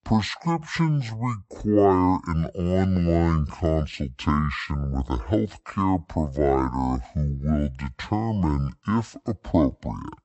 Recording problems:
wrong speed and pitch; too slow and too low; 0.6 times normal speed

